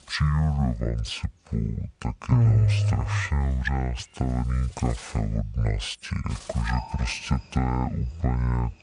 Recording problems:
wrong speed and pitch; too slow and too low; 0.6 times normal speed
animal sounds; noticeable; throughout; 20 dB below the speech

